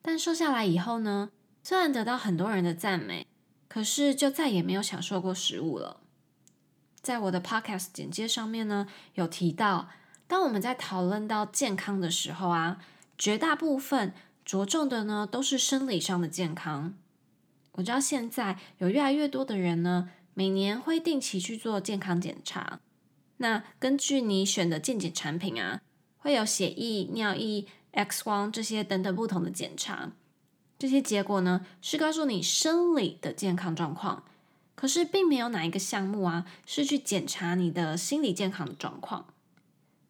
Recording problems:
none

